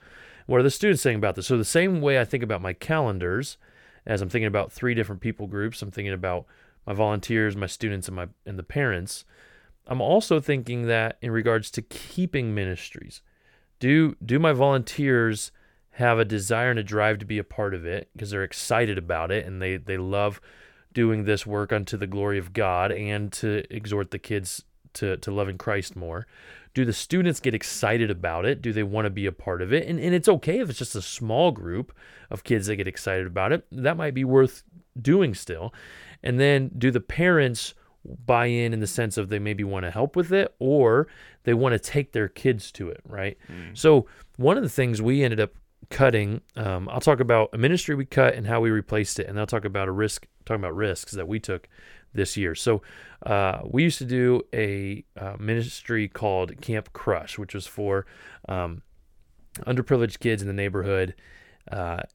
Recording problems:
none

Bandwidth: 18 kHz